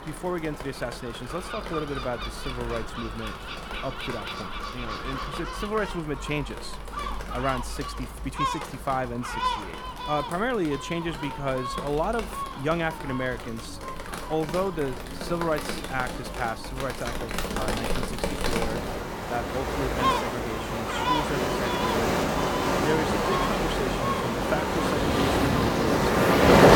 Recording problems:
rain or running water; very loud; throughout; 5 dB above the speech
animal sounds; loud; throughout; 3 dB below the speech

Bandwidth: 18.5 kHz